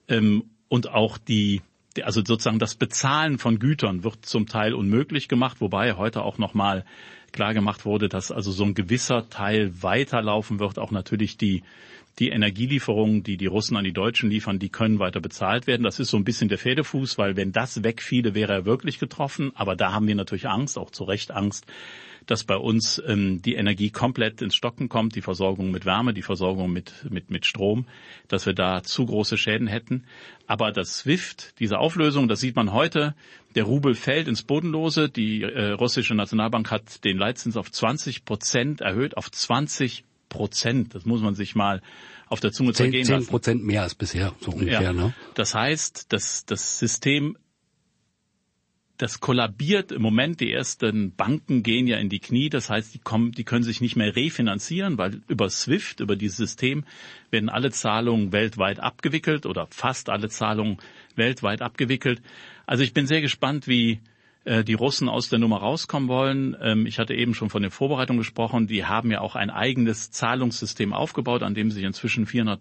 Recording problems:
garbled, watery; slightly; nothing above 7 kHz

